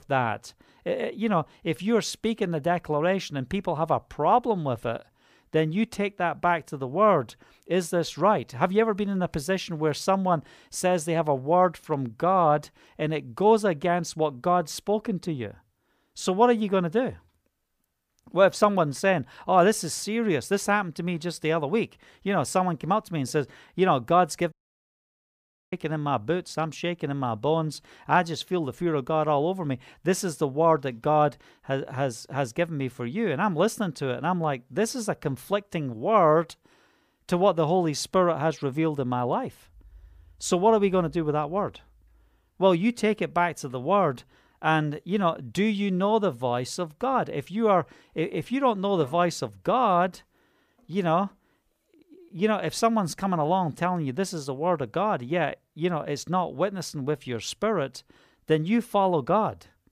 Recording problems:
audio cutting out; at 25 s for 1 s

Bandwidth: 15 kHz